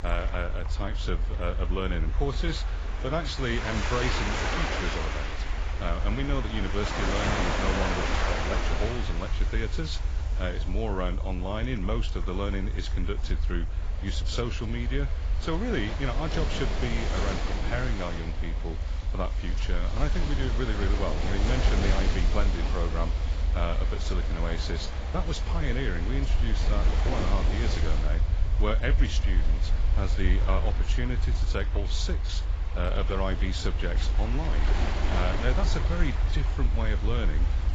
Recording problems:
garbled, watery; badly; nothing above 7.5 kHz
rain or running water; loud; throughout; 3 dB below the speech
low rumble; noticeable; throughout; 15 dB below the speech

